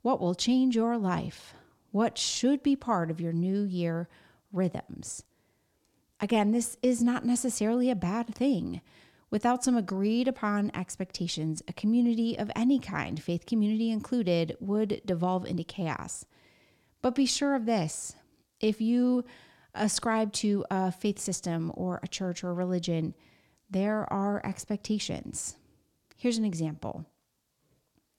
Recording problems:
none

